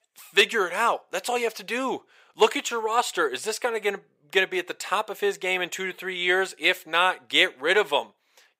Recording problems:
thin; somewhat; fading below 500 Hz

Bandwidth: 15.5 kHz